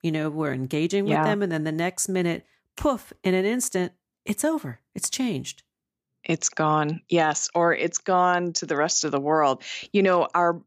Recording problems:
none

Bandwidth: 15 kHz